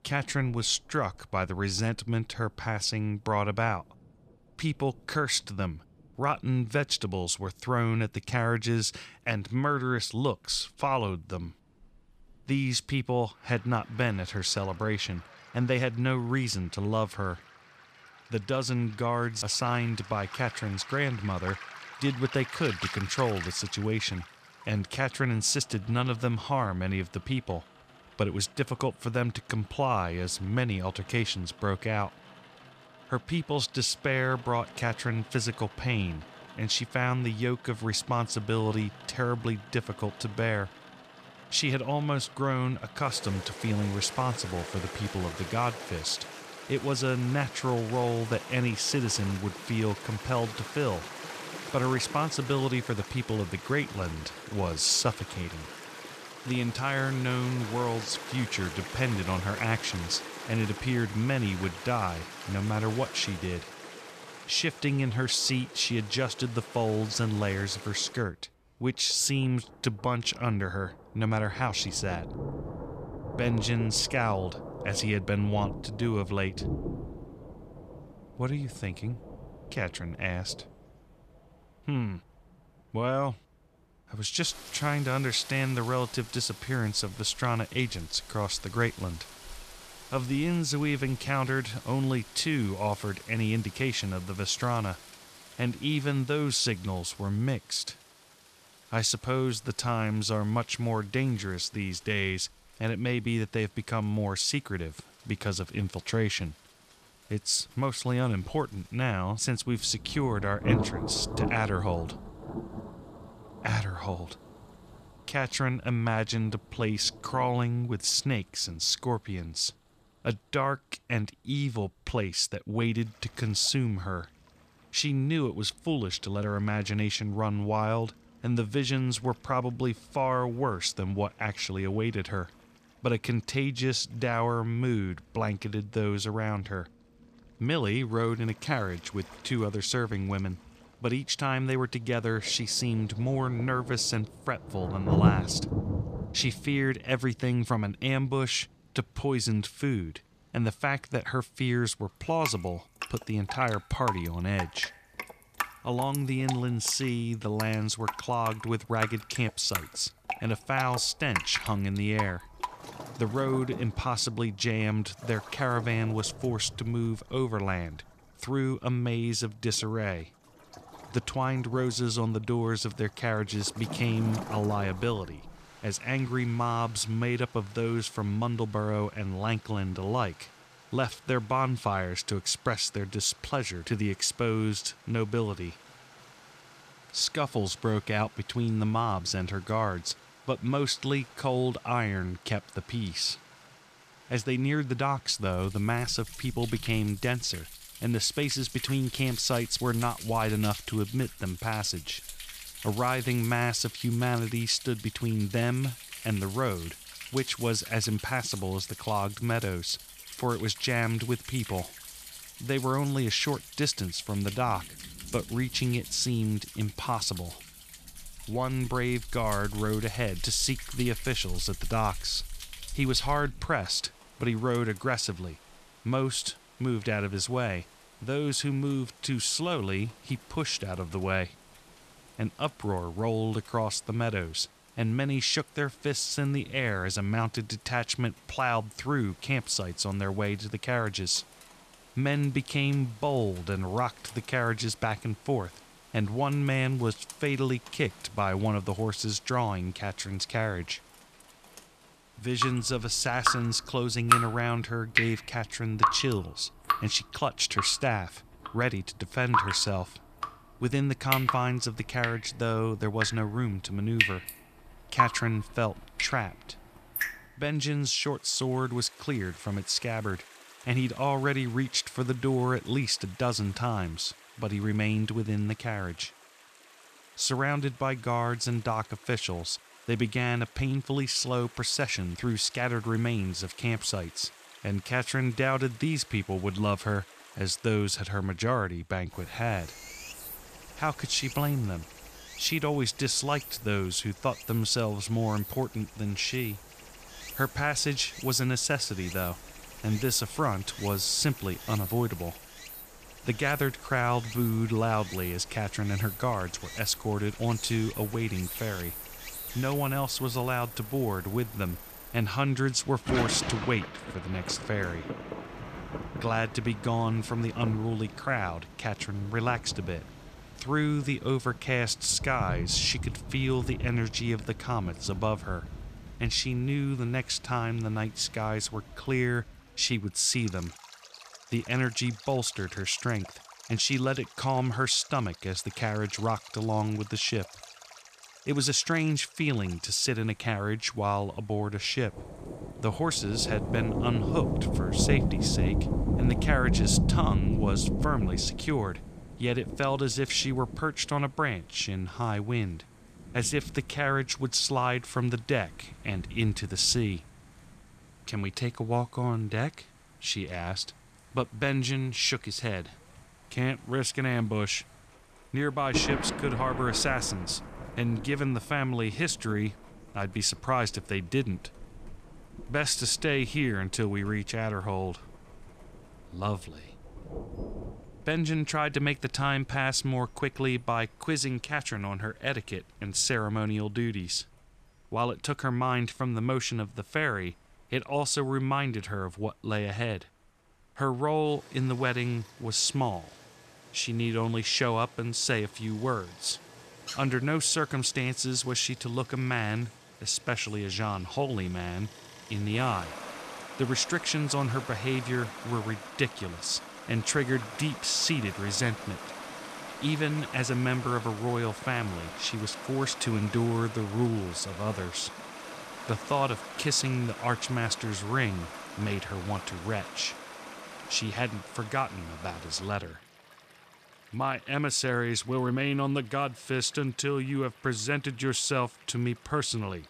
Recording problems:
rain or running water; loud; throughout; 9 dB below the speech

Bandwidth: 14.5 kHz